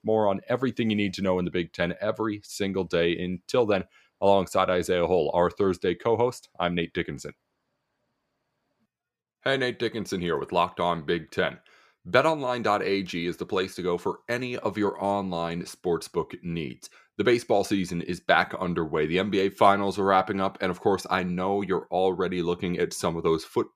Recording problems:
none

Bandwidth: 15 kHz